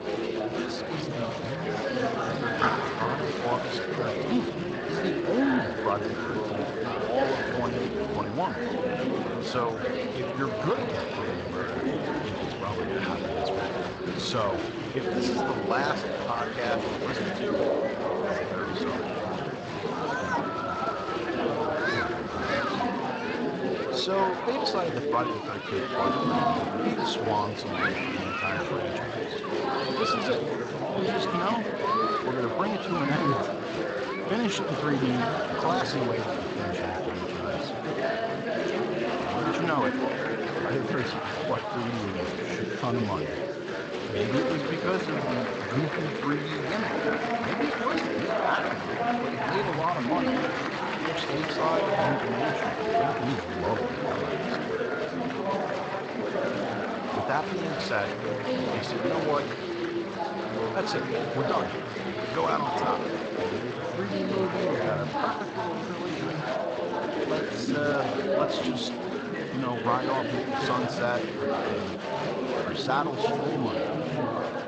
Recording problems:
garbled, watery; slightly; nothing above 7.5 kHz
murmuring crowd; very loud; throughout; 3 dB above the speech

